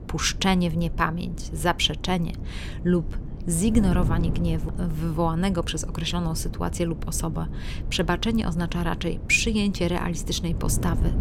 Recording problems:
wind noise on the microphone; occasional gusts; 15 dB below the speech

